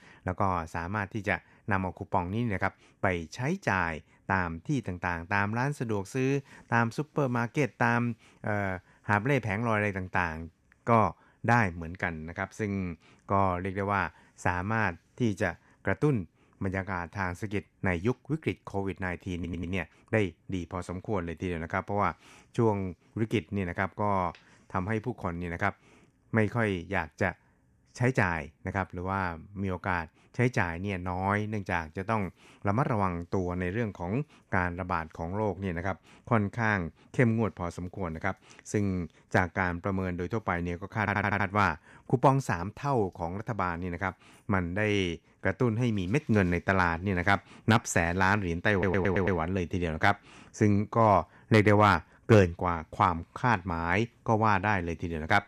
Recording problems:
audio stuttering; at 19 s, at 41 s and at 49 s

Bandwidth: 14 kHz